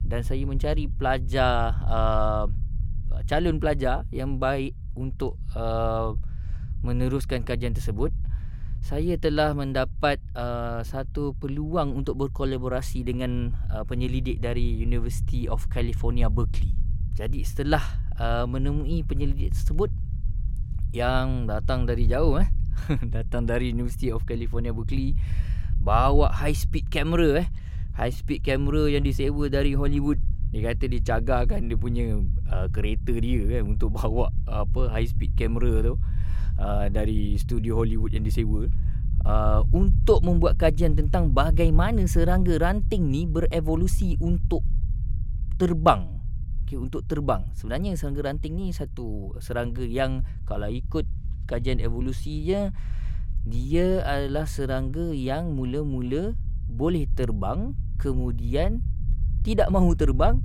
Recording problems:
low rumble; noticeable; throughout; 20 dB below the speech

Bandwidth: 16.5 kHz